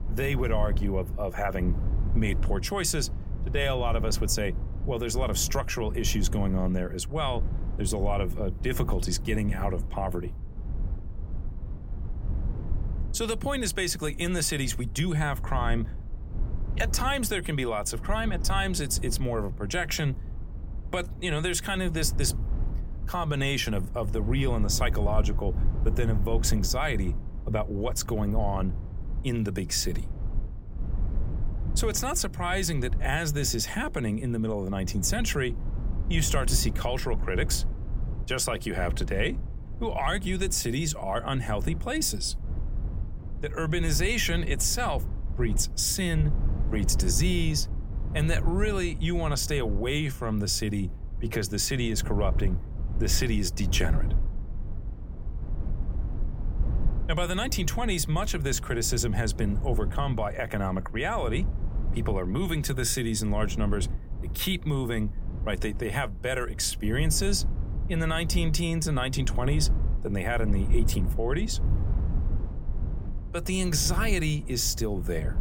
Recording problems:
low rumble; noticeable; throughout; 15 dB below the speech

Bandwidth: 16.5 kHz